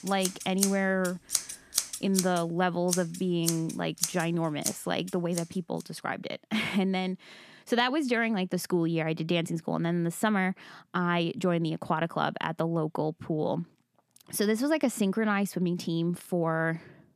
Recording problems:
household noises; loud; until 5.5 s; 3 dB below the speech

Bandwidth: 14.5 kHz